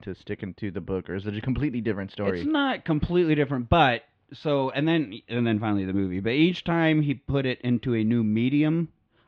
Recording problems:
muffled; slightly; fading above 3 kHz

